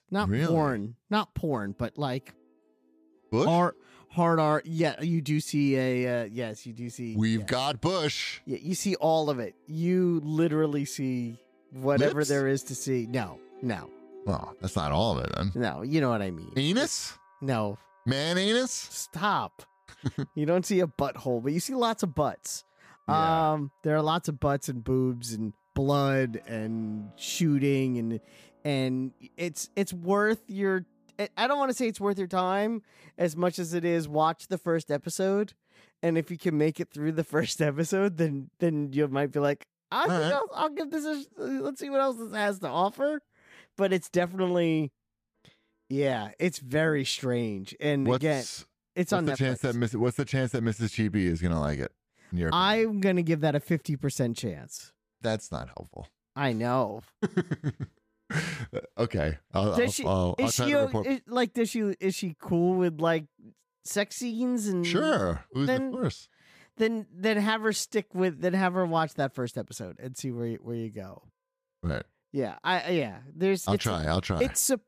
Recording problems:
background music; faint; throughout; 30 dB below the speech

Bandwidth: 15 kHz